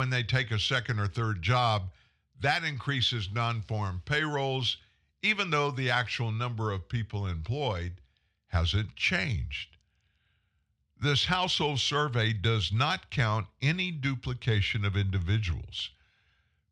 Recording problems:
abrupt cut into speech; at the start

